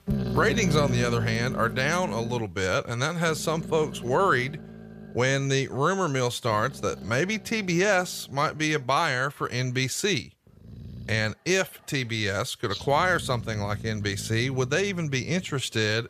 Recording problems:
animal sounds; loud; throughout; 10 dB below the speech

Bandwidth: 14.5 kHz